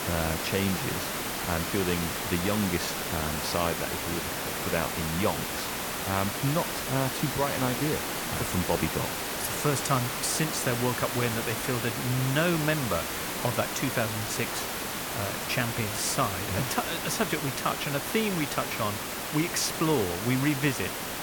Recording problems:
hiss; loud; throughout; 1 dB below the speech

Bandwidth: 18 kHz